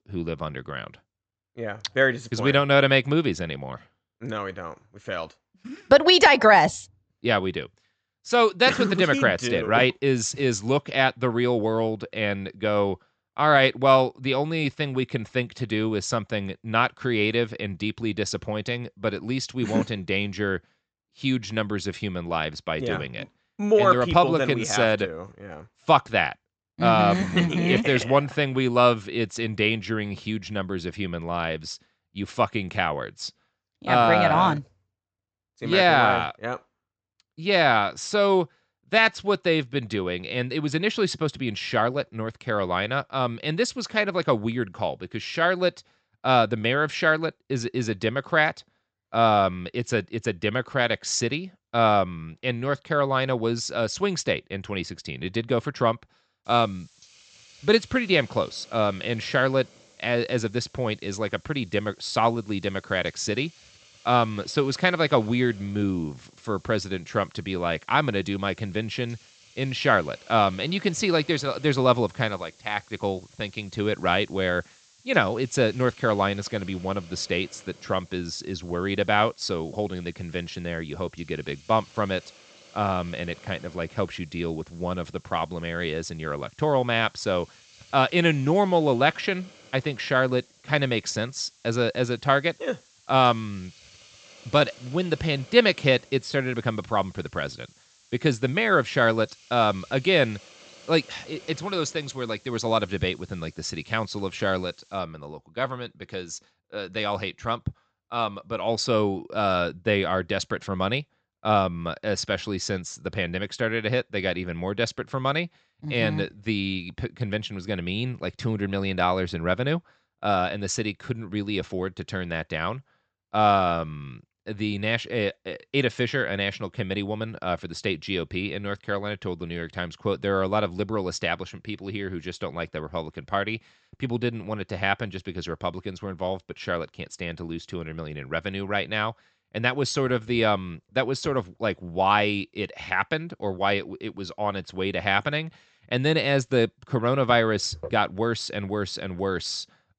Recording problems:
high frequencies cut off; noticeable; nothing above 8 kHz
hiss; faint; from 56 s to 1:45; 25 dB below the speech

